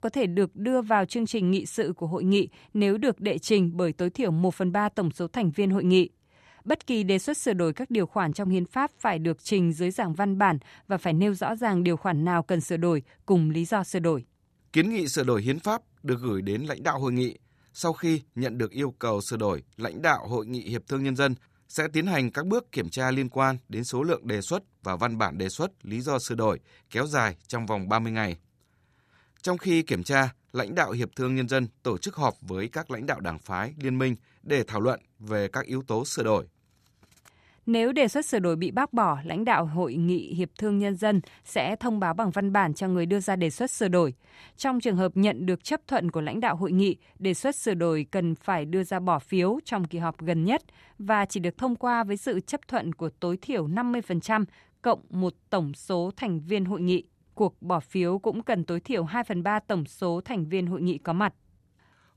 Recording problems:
none

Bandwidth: 14.5 kHz